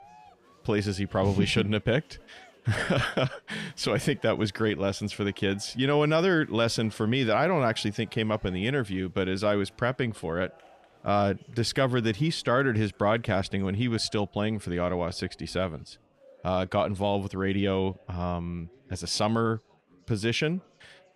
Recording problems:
chatter from many people; faint; throughout; 30 dB below the speech

